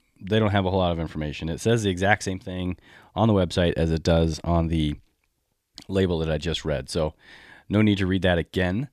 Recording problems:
none

